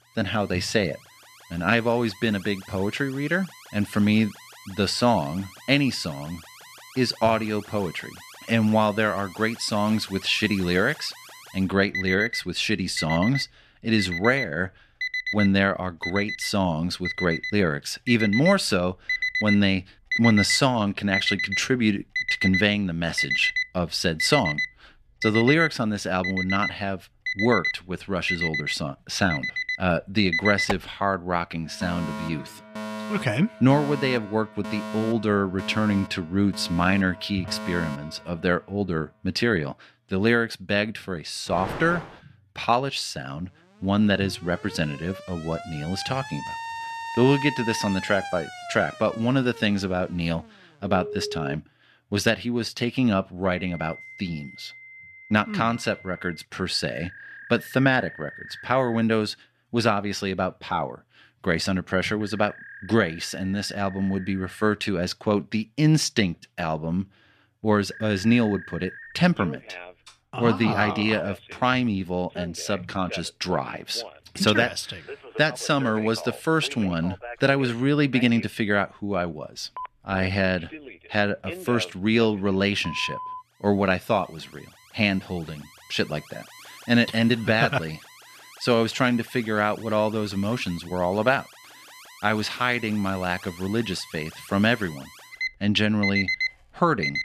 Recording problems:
alarms or sirens; loud; throughout; 8 dB below the speech

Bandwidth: 14.5 kHz